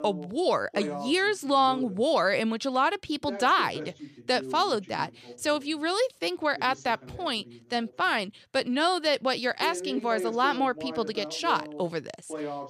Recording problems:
voice in the background; noticeable; throughout; 15 dB below the speech

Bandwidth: 14.5 kHz